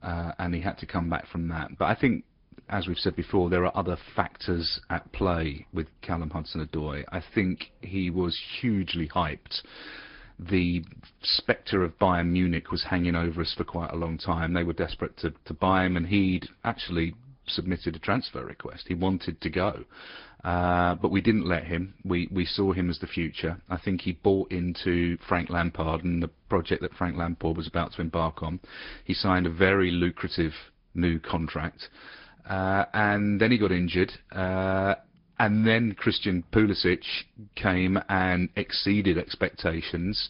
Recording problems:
high frequencies cut off; noticeable; nothing above 5 kHz
garbled, watery; slightly

